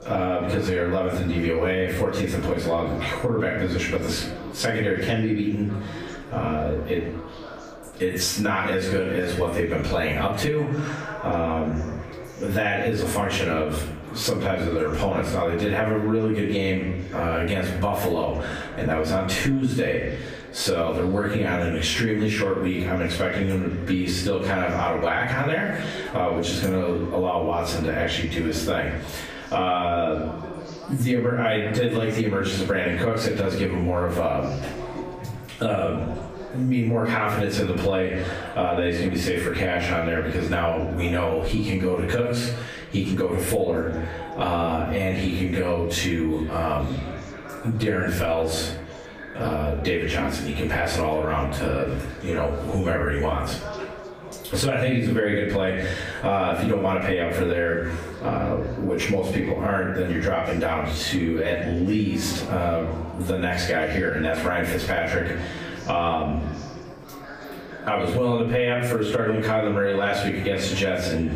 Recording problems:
off-mic speech; far
squashed, flat; heavily, background pumping
room echo; noticeable; dies away in 0.5 s
echo of what is said; faint; throughout; 360 ms later, 20 dB below the speech
chatter from many people; noticeable; throughout; 15 dB below the speech

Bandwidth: 15 kHz